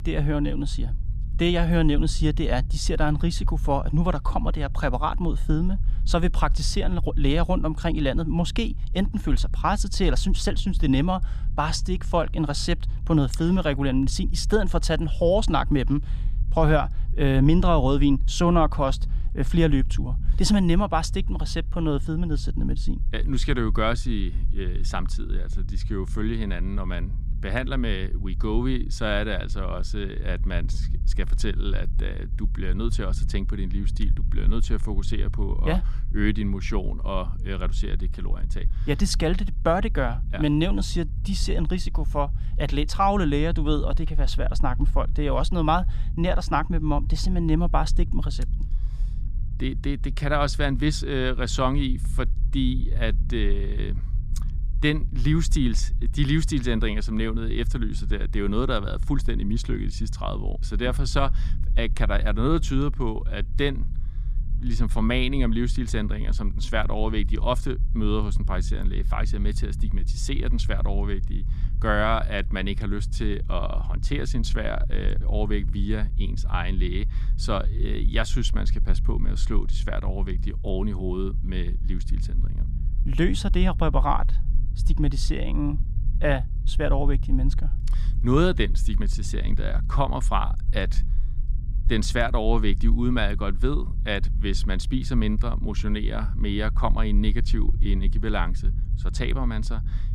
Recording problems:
low rumble; faint; throughout; 20 dB below the speech

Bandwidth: 15 kHz